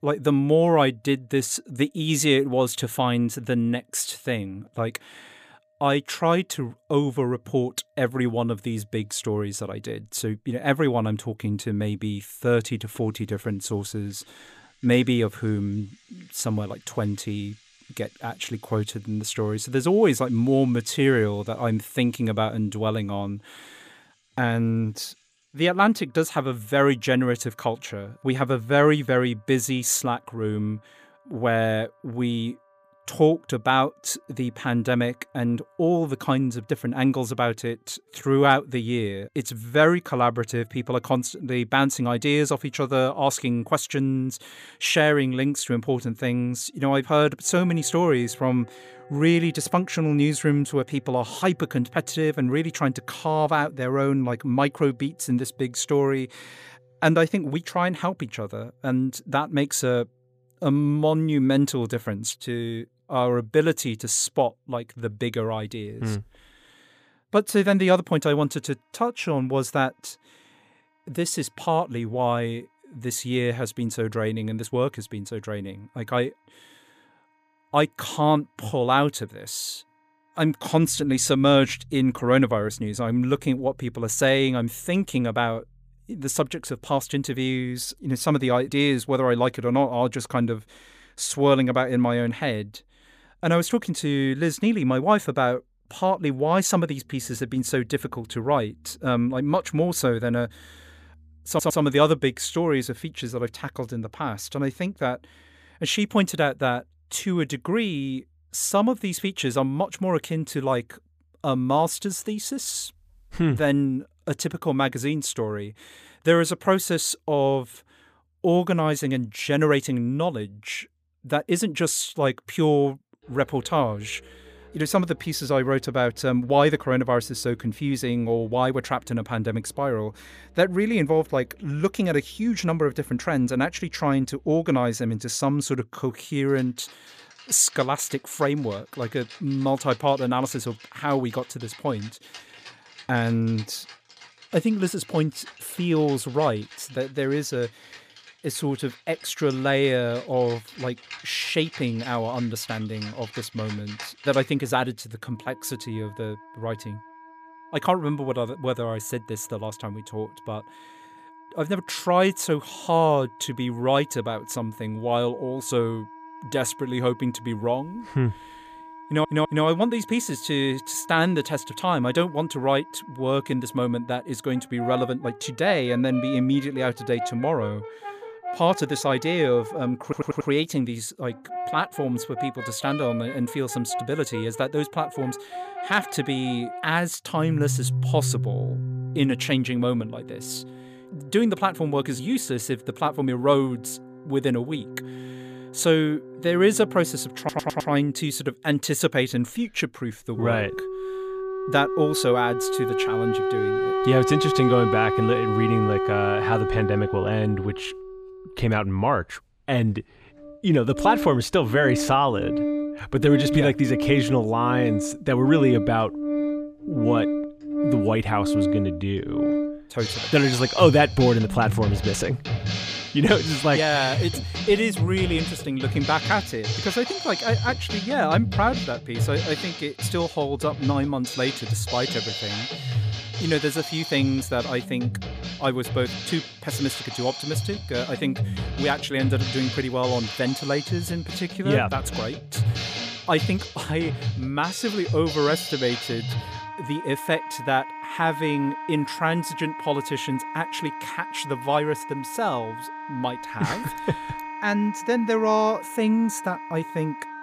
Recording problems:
background music; loud; throughout; 6 dB below the speech
audio stuttering; 4 times, first at 1:41

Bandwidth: 15 kHz